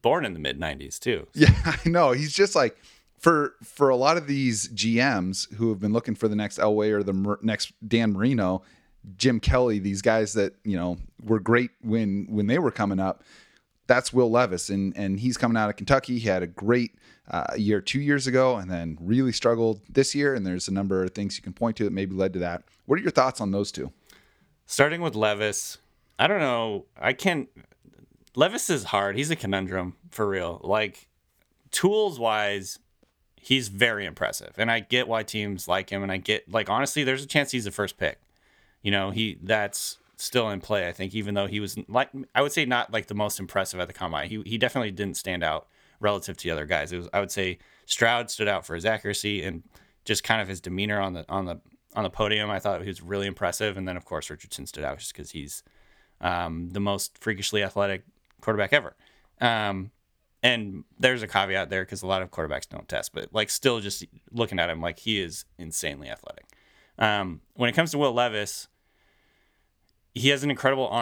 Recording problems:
abrupt cut into speech; at the end

